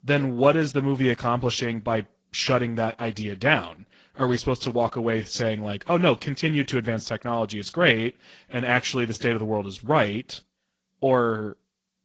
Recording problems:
garbled, watery; slightly

